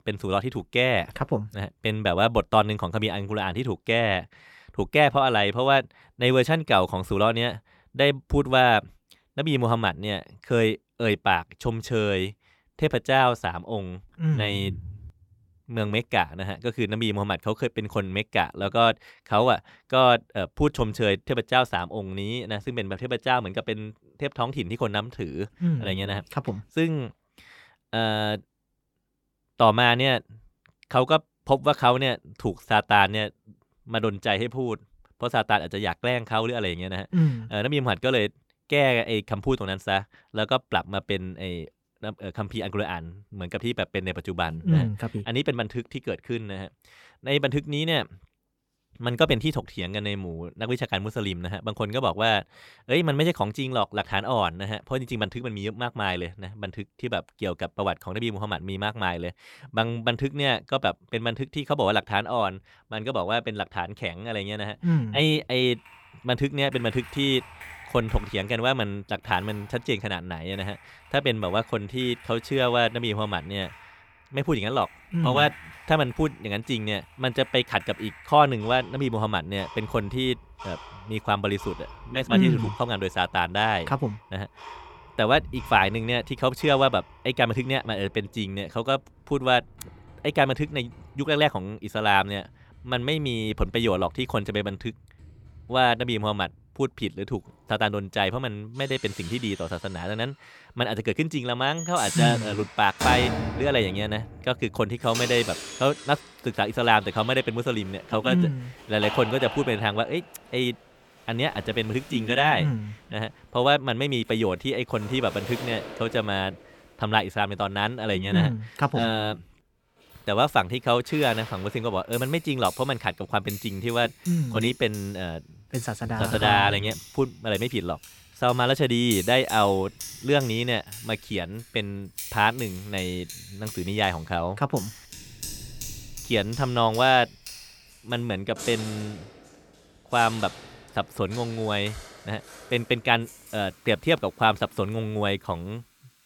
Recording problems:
household noises; noticeable; from 1:06 on; 15 dB below the speech

